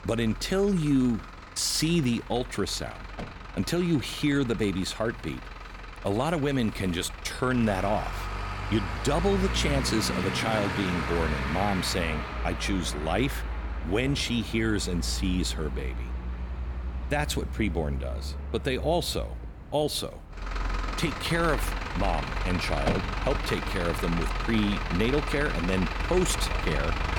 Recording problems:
traffic noise; loud; throughout; 5 dB below the speech

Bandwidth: 18 kHz